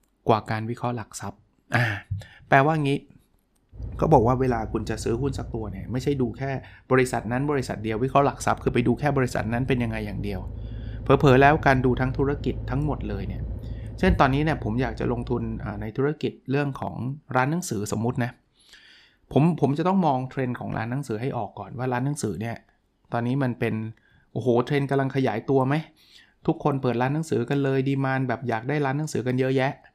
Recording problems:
low rumble; faint; from 4 to 16 s; 25 dB below the speech

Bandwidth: 15 kHz